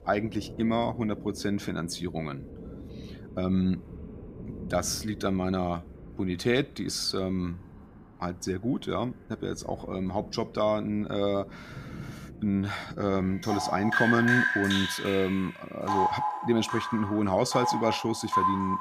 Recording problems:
rain or running water; loud; throughout; 3 dB below the speech

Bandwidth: 15 kHz